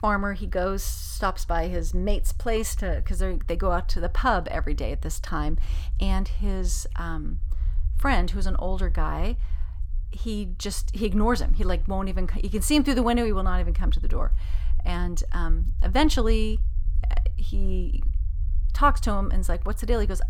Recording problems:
low rumble; faint; throughout; 25 dB below the speech

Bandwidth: 18 kHz